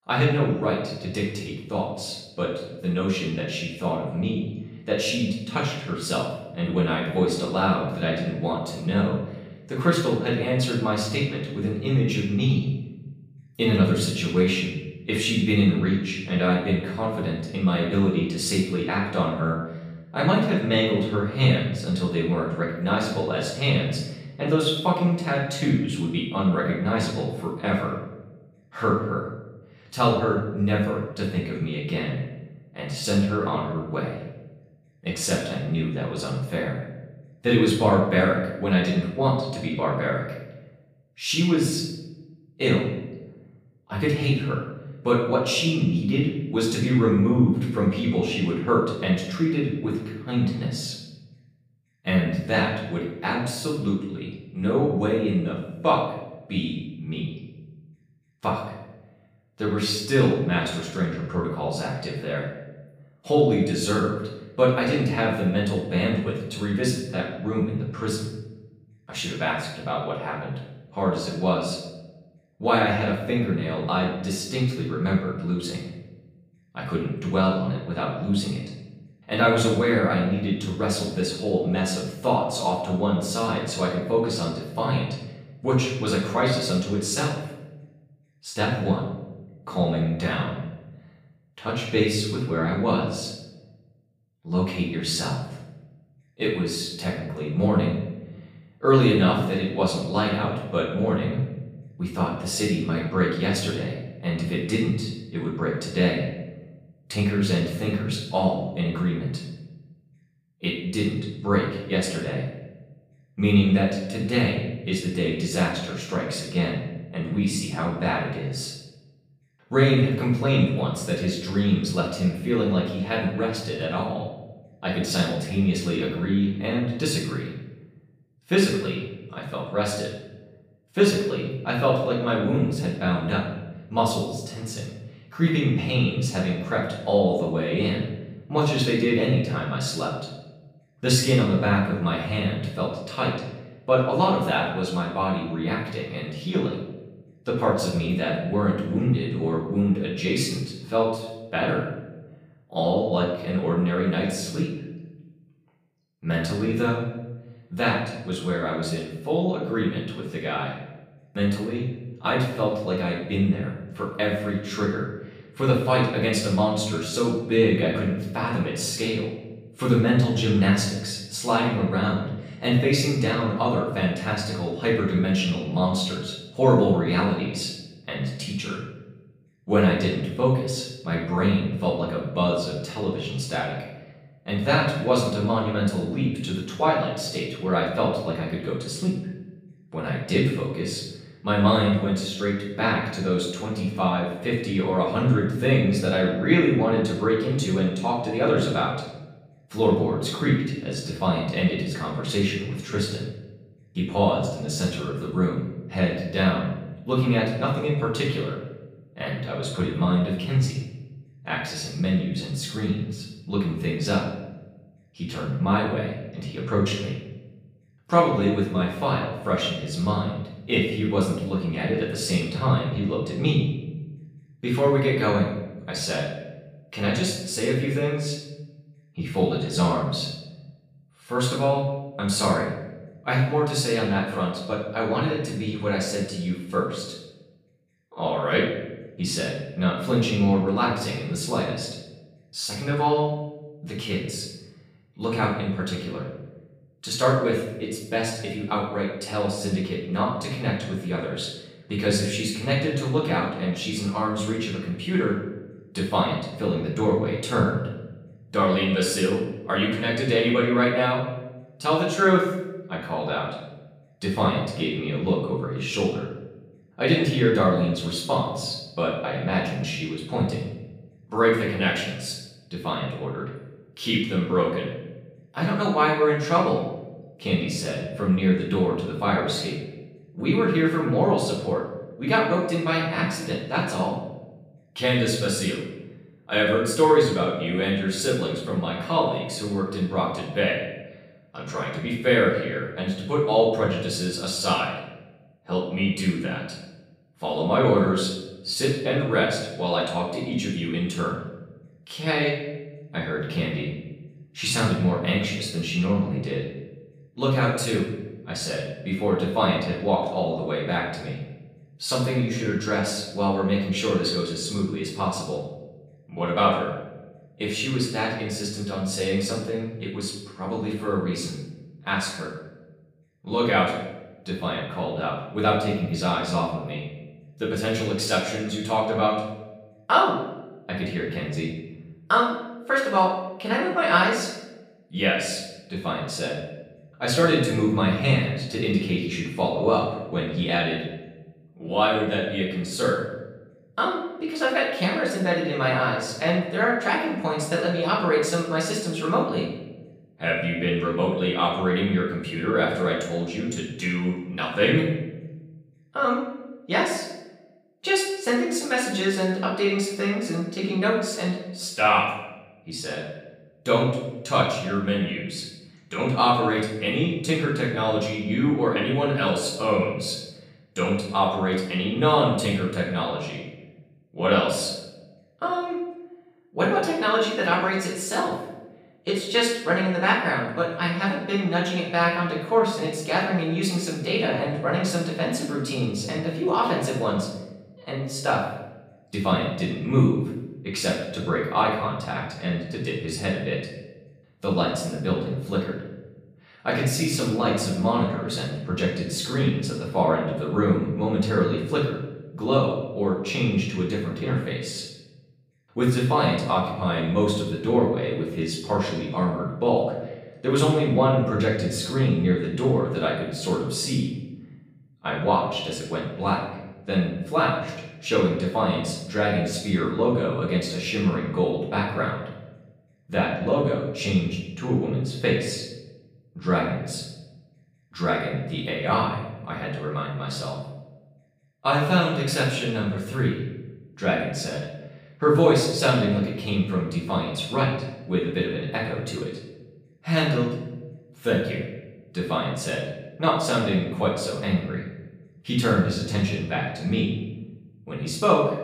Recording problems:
off-mic speech; far
room echo; noticeable; dies away in 0.9 s

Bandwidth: 15 kHz